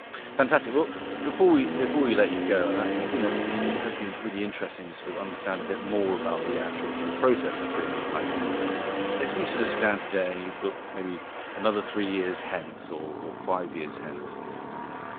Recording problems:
phone-call audio
traffic noise; loud; throughout; 3 dB below the speech

